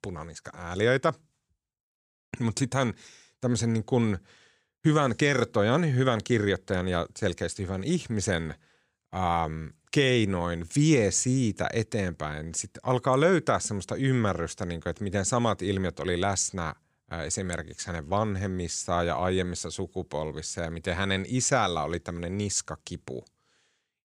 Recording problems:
none

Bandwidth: 15.5 kHz